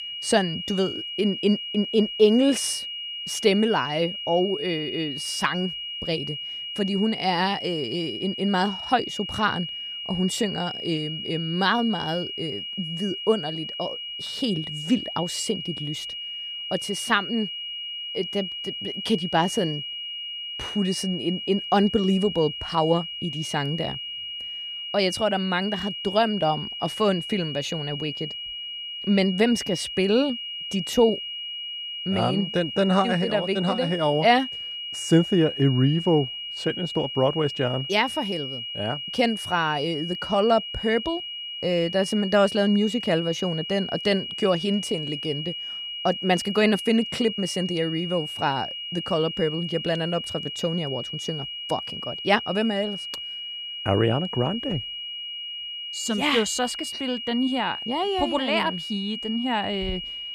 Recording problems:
high-pitched whine; loud; throughout; 3 kHz, 6 dB below the speech

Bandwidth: 14.5 kHz